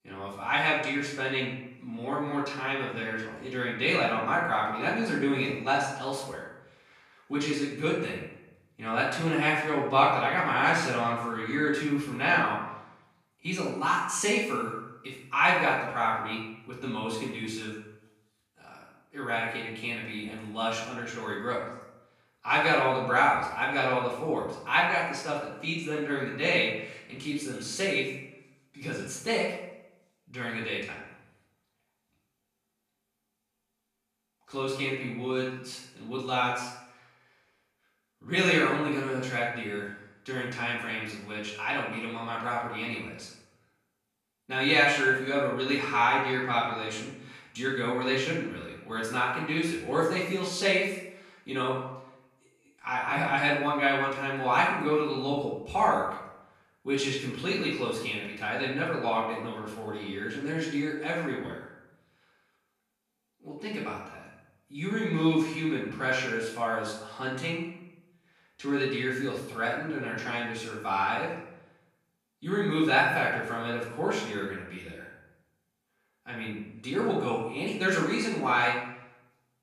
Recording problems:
off-mic speech; far
room echo; noticeable; dies away in 0.7 s

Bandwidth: 14.5 kHz